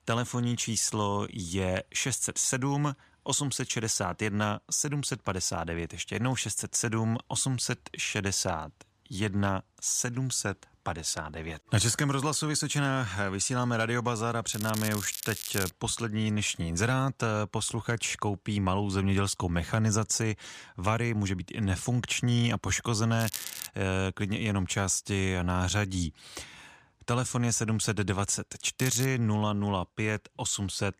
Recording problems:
crackling; loud; from 14 to 16 s, at 23 s and at 29 s; 8 dB below the speech

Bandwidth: 14.5 kHz